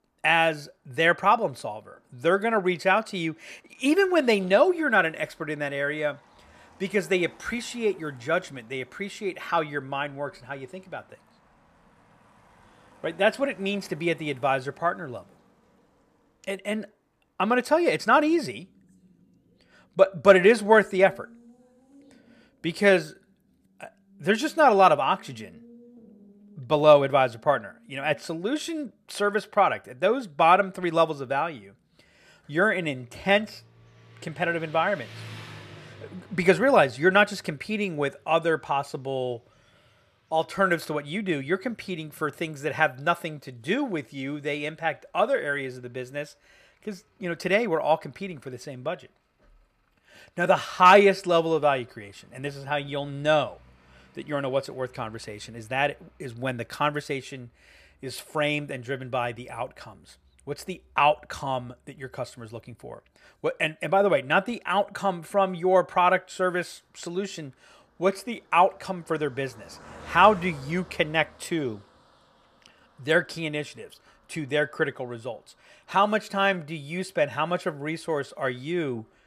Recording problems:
traffic noise; faint; throughout; 30 dB below the speech

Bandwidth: 14.5 kHz